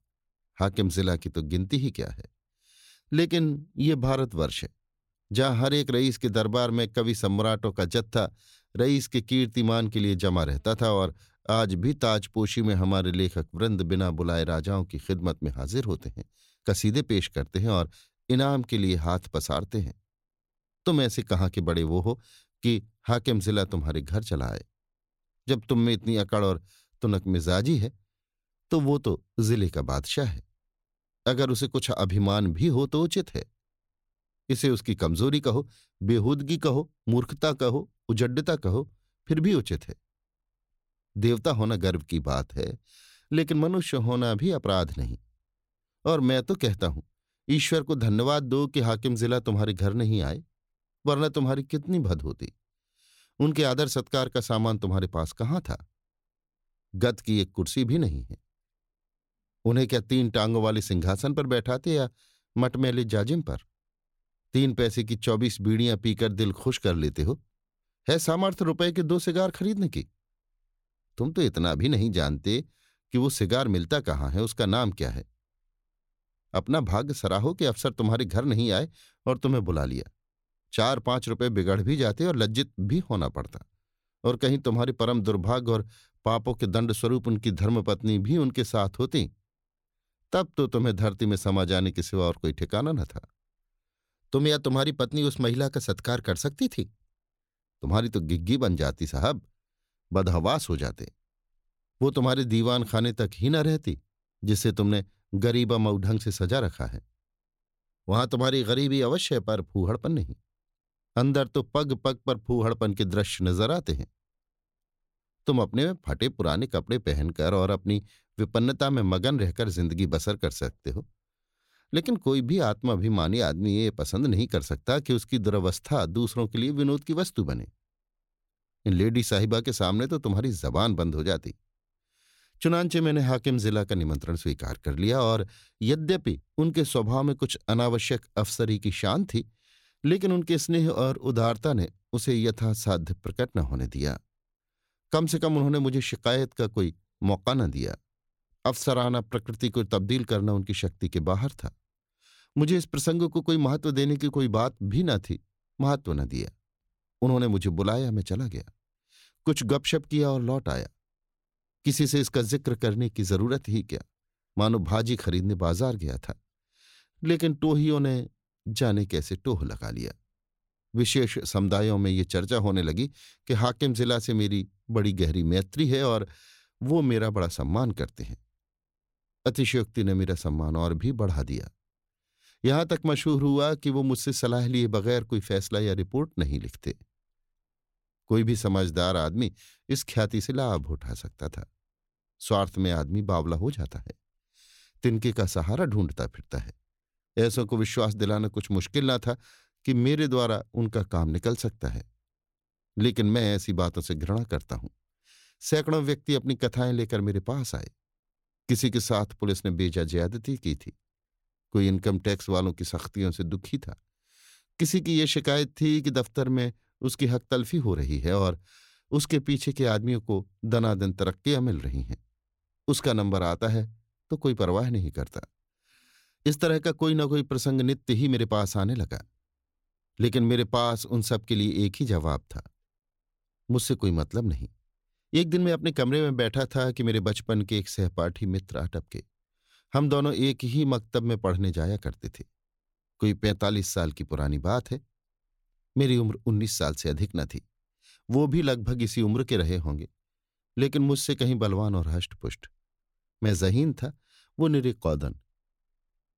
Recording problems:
none

